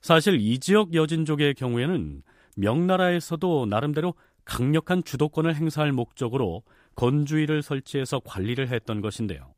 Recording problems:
none

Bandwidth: 15 kHz